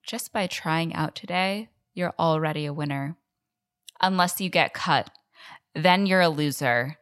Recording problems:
none

